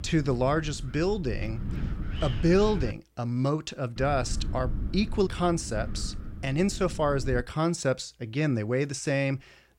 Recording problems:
wind noise on the microphone; occasional gusts; until 3 s and from 4 to 7.5 s; 15 dB below the speech

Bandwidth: 16 kHz